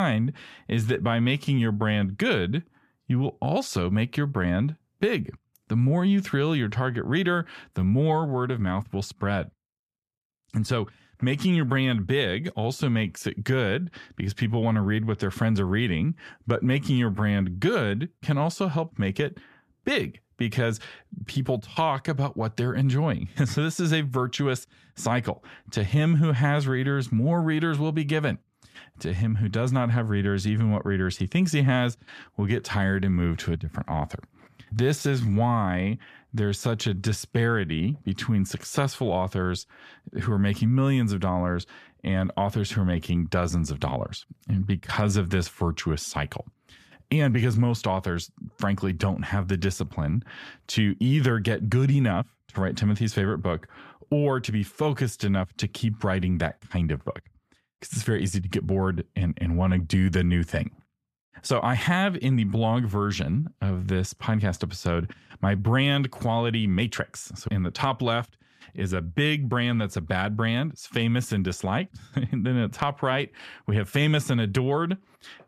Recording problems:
abrupt cut into speech; at the start

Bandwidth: 14.5 kHz